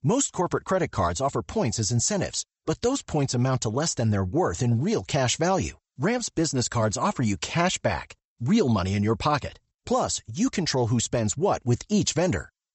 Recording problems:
high frequencies cut off; noticeable; nothing above 8 kHz

